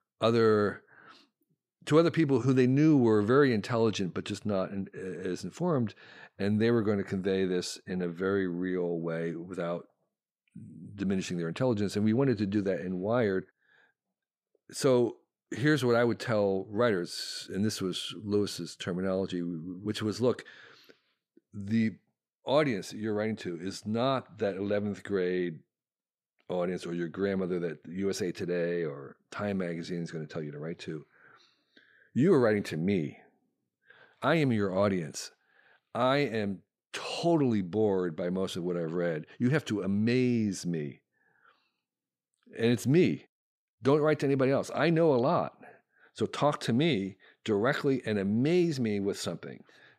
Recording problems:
none

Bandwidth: 15 kHz